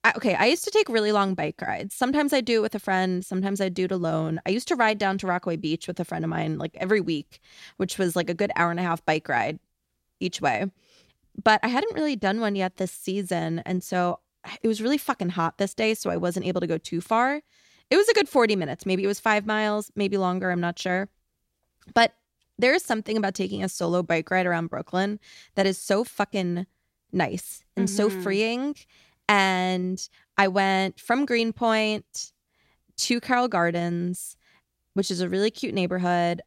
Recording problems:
none

